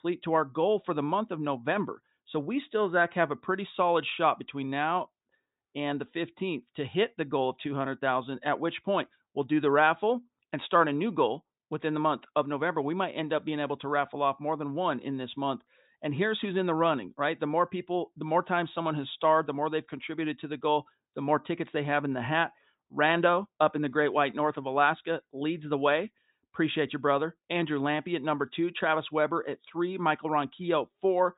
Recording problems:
high frequencies cut off; severe; nothing above 4 kHz

